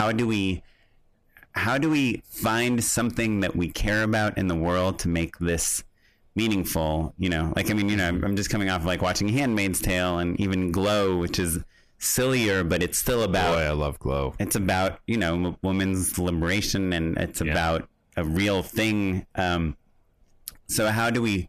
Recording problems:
distortion; slight; 6% of the sound clipped
squashed, flat; somewhat
abrupt cut into speech; at the start

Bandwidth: 14.5 kHz